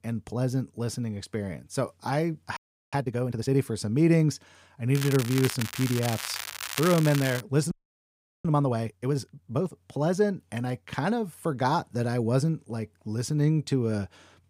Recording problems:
crackling; loud; from 5 to 7.5 s; 6 dB below the speech
audio freezing; at 2.5 s and at 7.5 s for 0.5 s

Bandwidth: 15.5 kHz